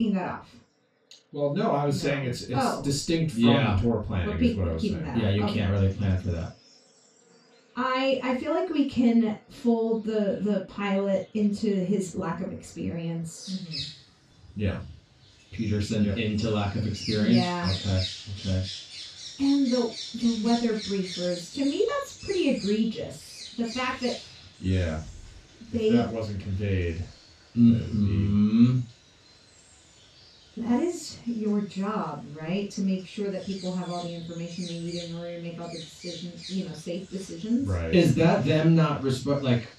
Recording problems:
off-mic speech; far
room echo; noticeable; dies away in 0.2 s
animal sounds; noticeable; throughout; 15 dB below the speech
abrupt cut into speech; at the start

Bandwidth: 15 kHz